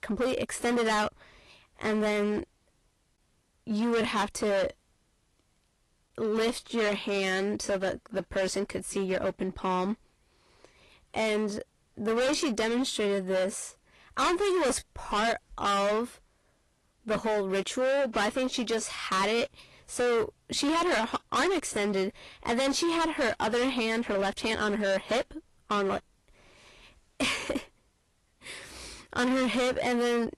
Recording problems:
distortion; heavy; 17% of the sound clipped
garbled, watery; slightly; nothing above 11 kHz

